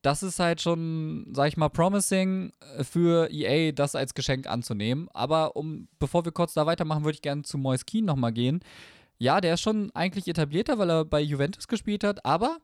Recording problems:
none

